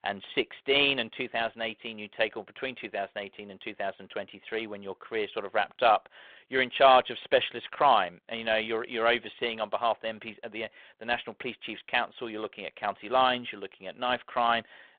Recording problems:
phone-call audio

